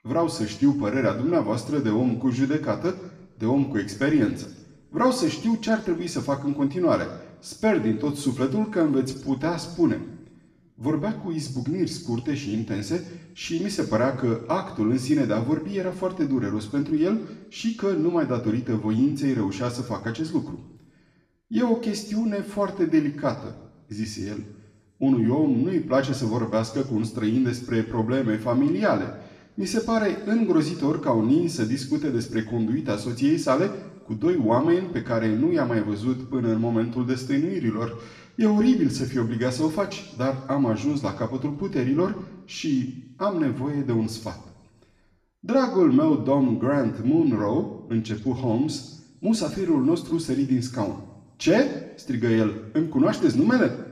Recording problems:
room echo; slight; dies away in 0.8 s
off-mic speech; somewhat distant

